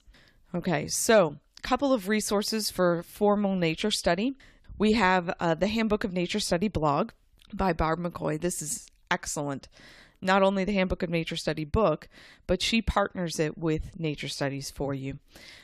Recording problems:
none

